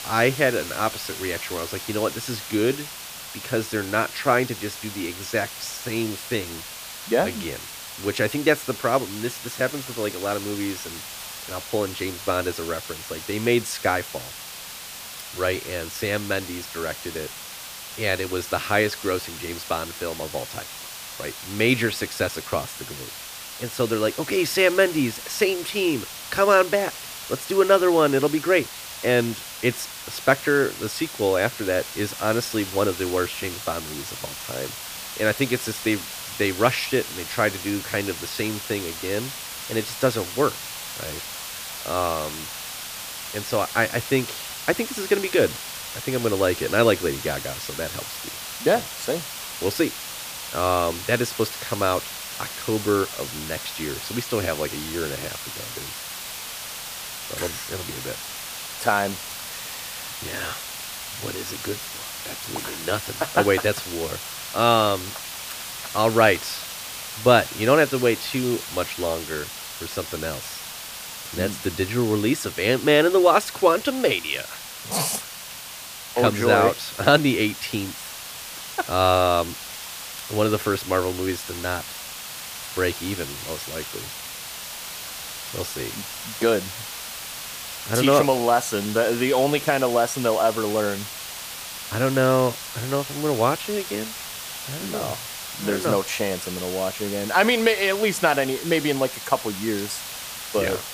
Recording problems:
hiss; loud; throughout; 9 dB below the speech

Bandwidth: 15 kHz